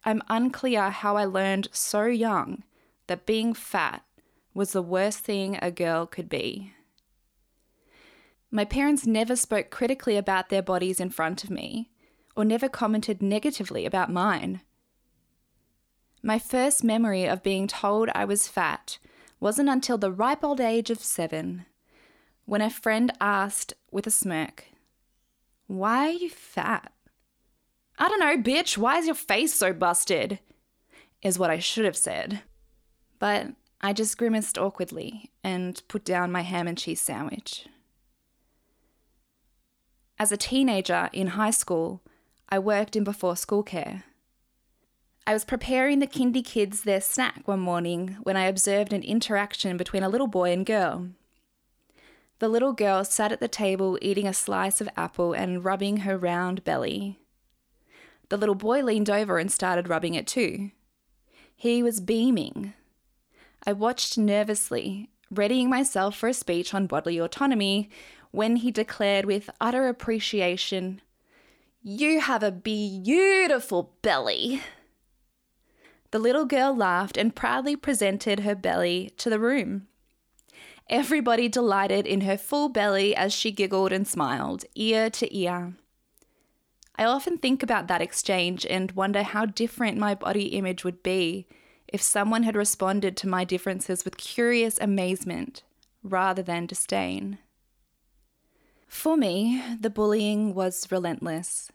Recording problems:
none

